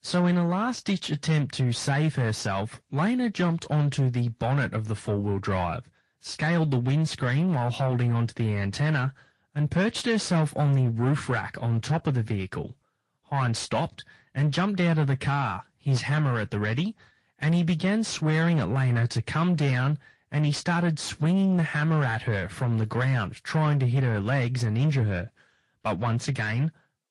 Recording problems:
distortion; slight; 9 dB below the speech
garbled, watery; slightly; nothing above 10.5 kHz

